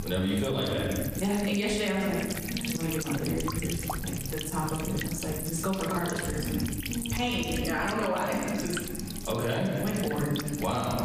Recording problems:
off-mic speech; far
room echo; noticeable; dies away in 1.4 s
squashed, flat; somewhat
electrical hum; loud; throughout; 50 Hz, 7 dB below the speech

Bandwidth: 15 kHz